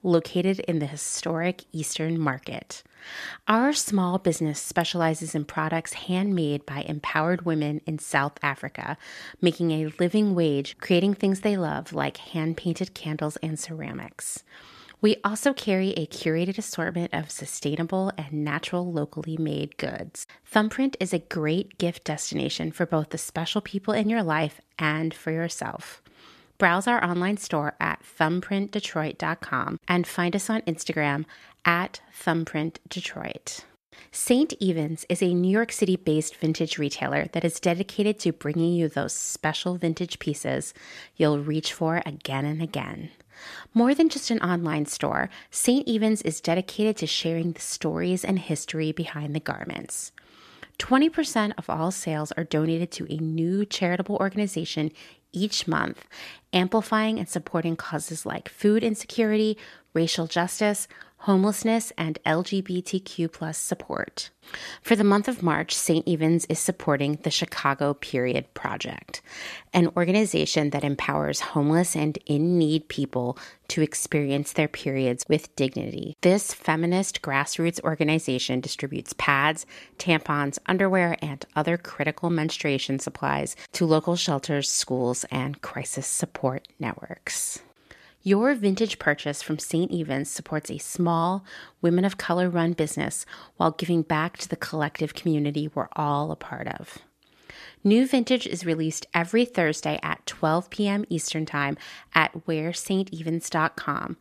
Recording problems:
none

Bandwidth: 14 kHz